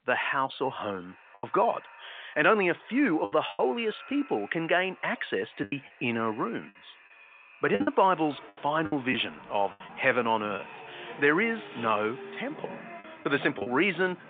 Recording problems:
echo of what is said; faint; throughout; 440 ms later, 25 dB below the speech
phone-call audio
traffic noise; noticeable; from 8 s on; 20 dB below the speech
choppy; very; 6% of the speech affected

